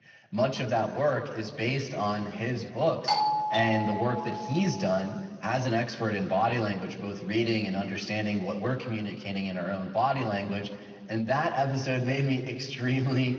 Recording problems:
room echo; slight; dies away in 1.6 s
off-mic speech; somewhat distant
garbled, watery; slightly; nothing above 6 kHz
doorbell; loud; from 3 to 4.5 s; peak 4 dB above the speech

